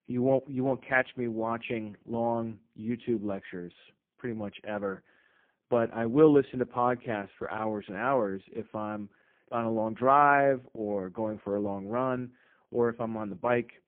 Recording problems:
phone-call audio; poor line

